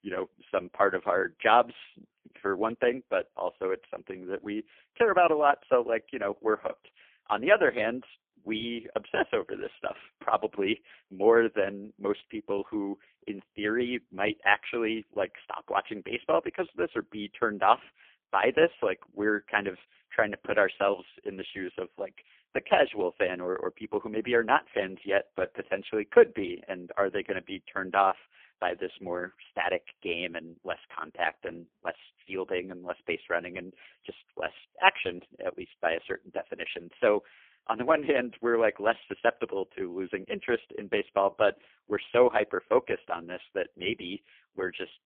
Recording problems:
phone-call audio; poor line; nothing above 3.5 kHz

